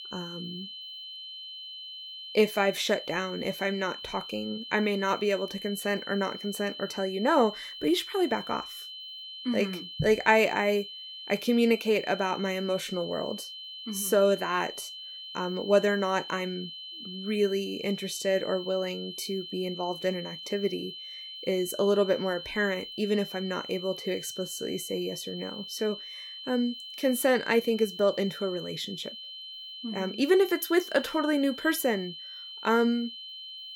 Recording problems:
high-pitched whine; noticeable; throughout; 3 kHz, 10 dB below the speech

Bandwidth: 16.5 kHz